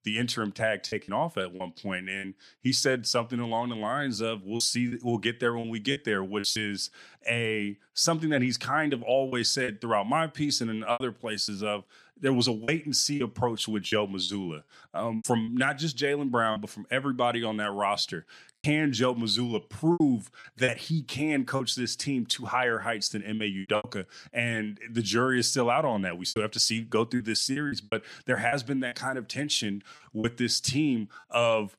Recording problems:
choppy; very; 6% of the speech affected

